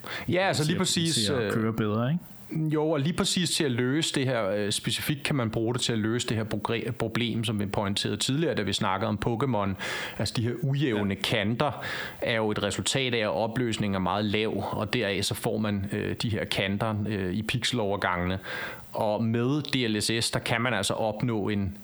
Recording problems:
squashed, flat; heavily

